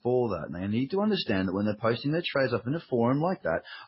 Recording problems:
garbled, watery; badly; nothing above 5.5 kHz

